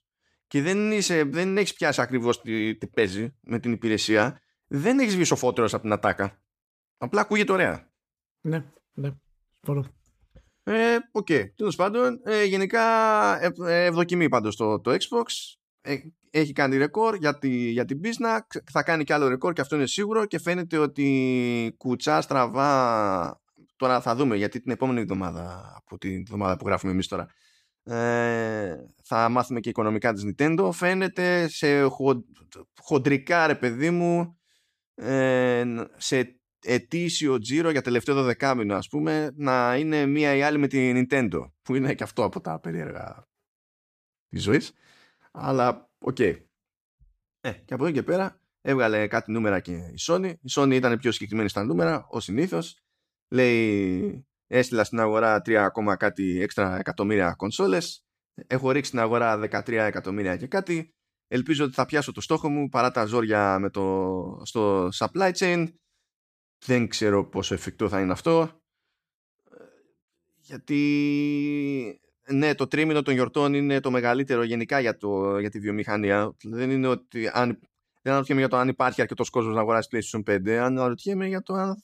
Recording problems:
none

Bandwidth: 14.5 kHz